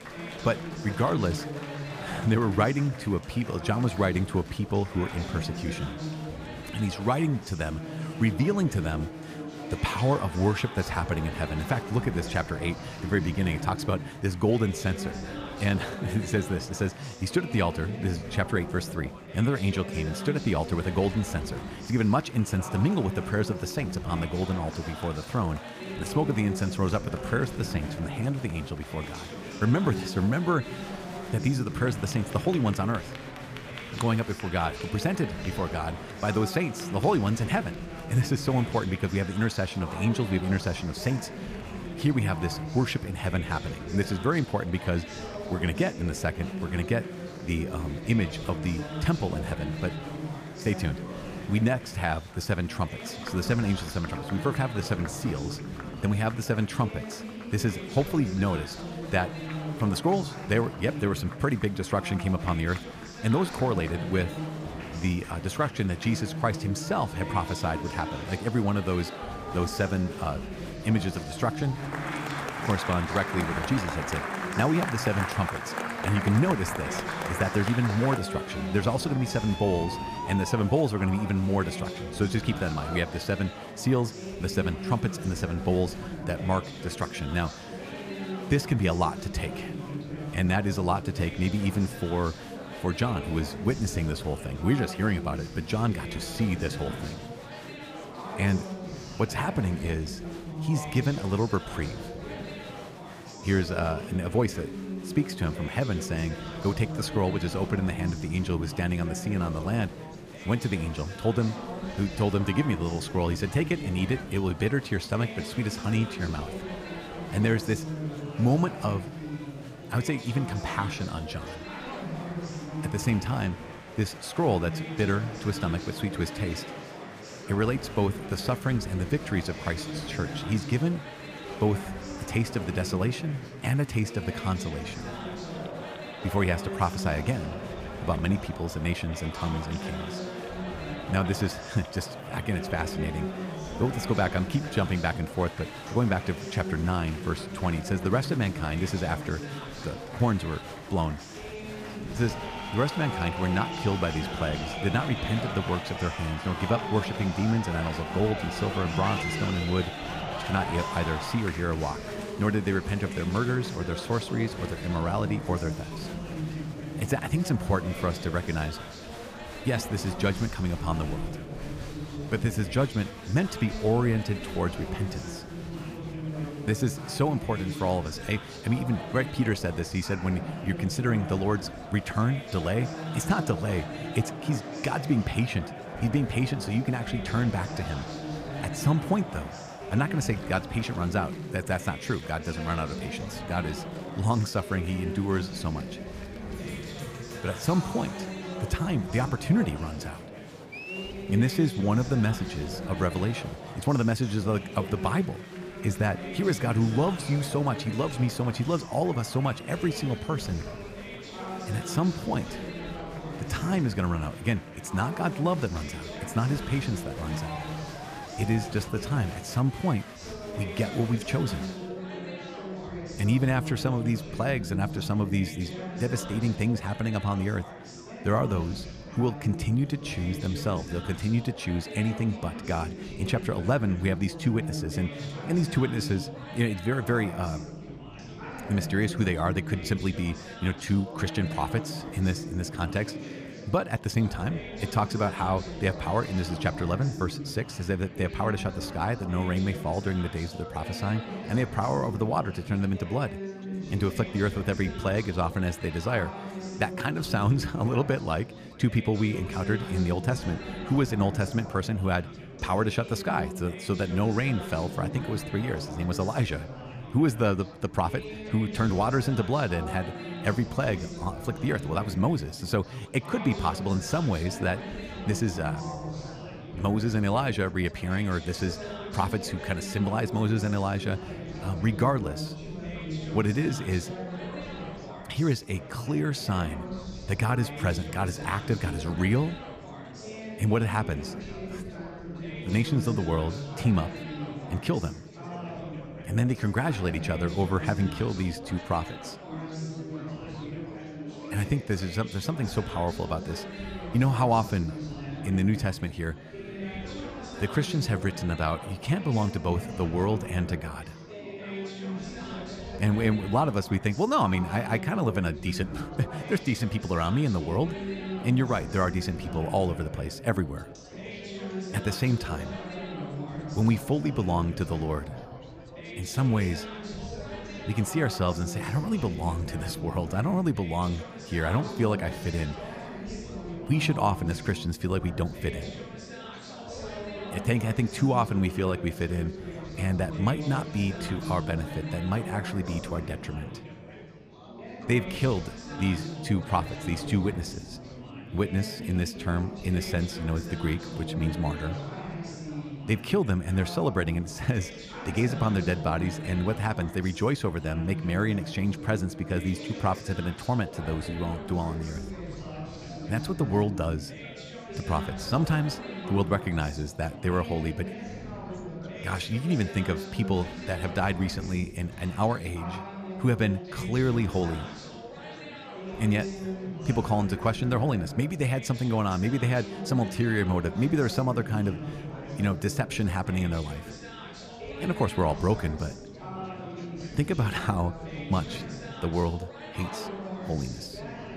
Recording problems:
chatter from many people; loud; throughout; 8 dB below the speech

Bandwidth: 15 kHz